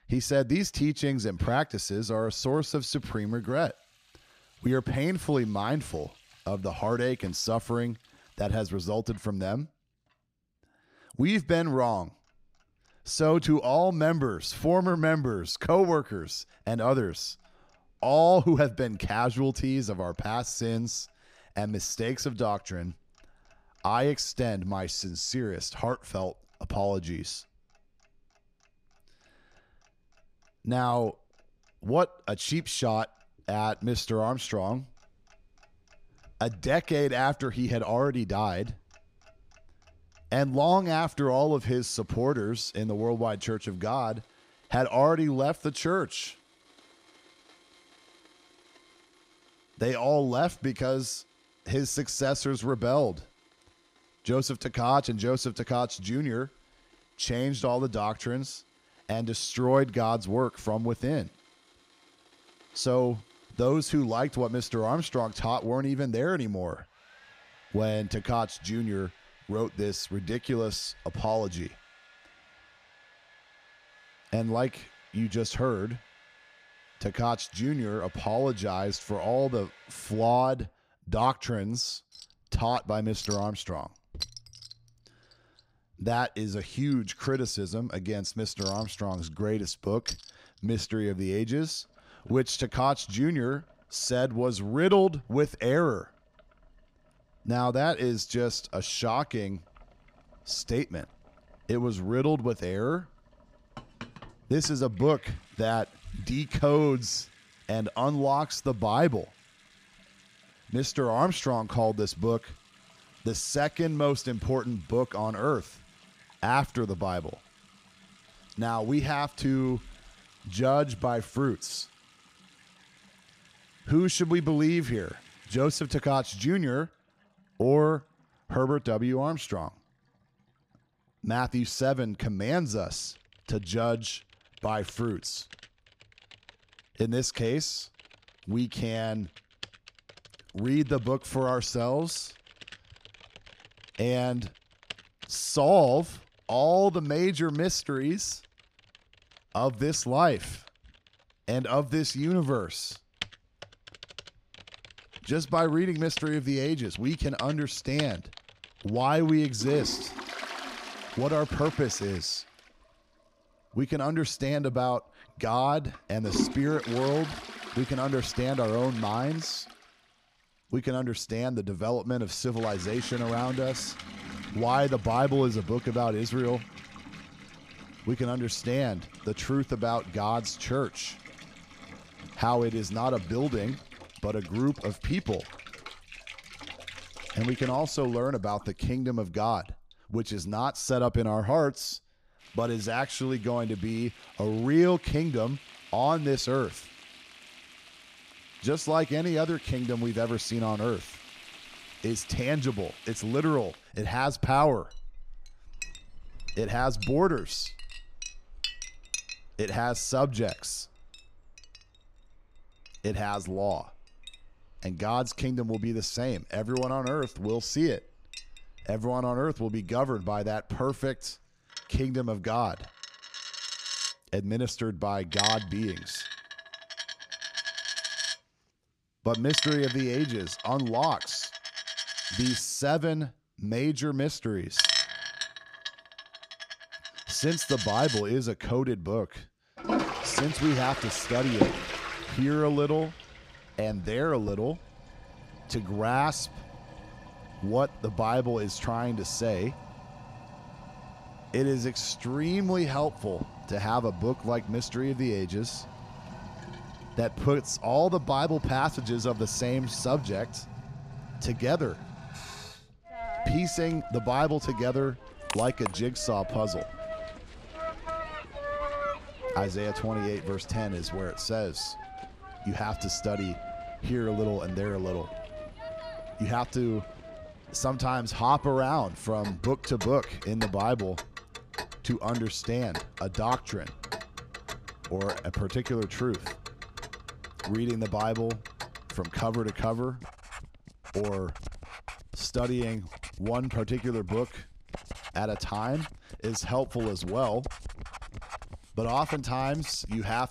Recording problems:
household noises; noticeable; throughout; 10 dB below the speech

